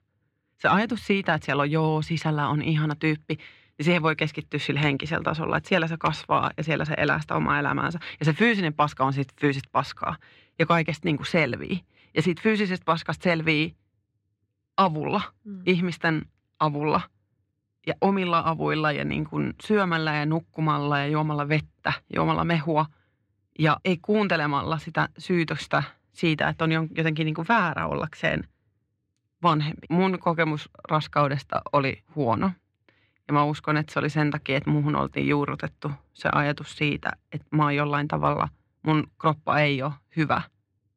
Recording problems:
muffled; slightly; fading above 3 kHz

